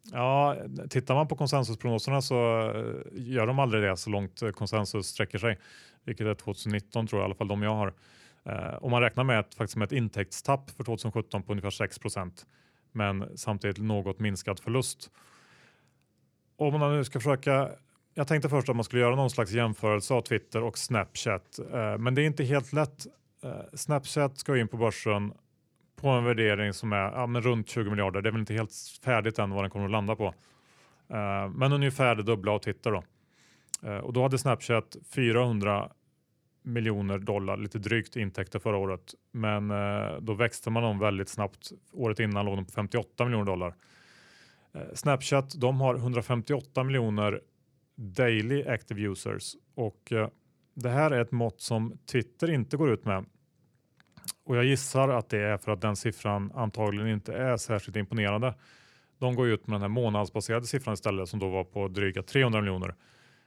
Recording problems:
uneven, jittery; strongly; from 6 s to 1:02

